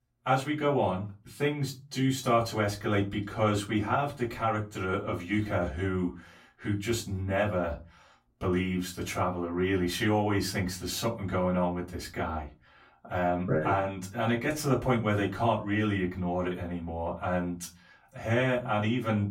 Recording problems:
off-mic speech; far
room echo; very slight; dies away in 0.3 s

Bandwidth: 16.5 kHz